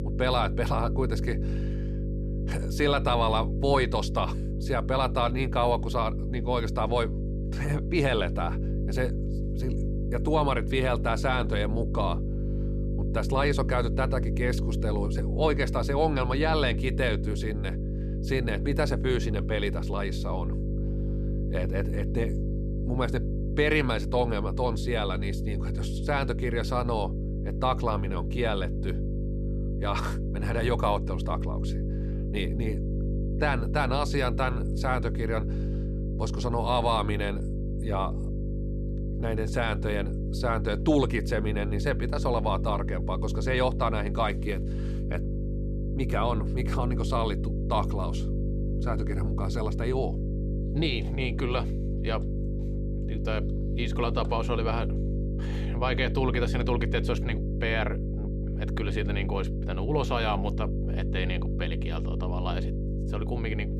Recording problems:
electrical hum; noticeable; throughout; 50 Hz, 10 dB below the speech

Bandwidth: 14 kHz